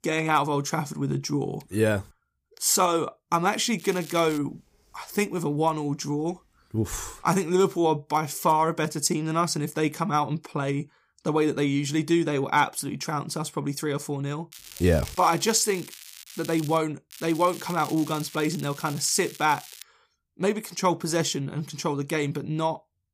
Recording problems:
crackling; noticeable; at 4 s, from 15 to 17 s and from 17 to 20 s; 15 dB below the speech

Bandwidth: 15 kHz